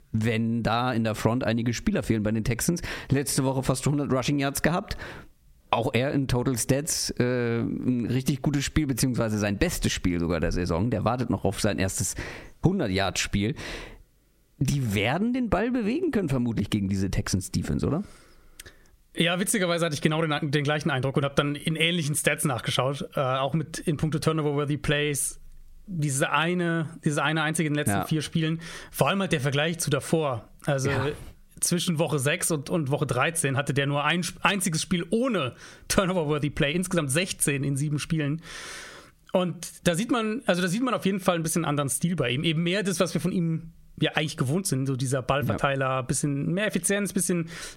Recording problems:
squashed, flat; heavily

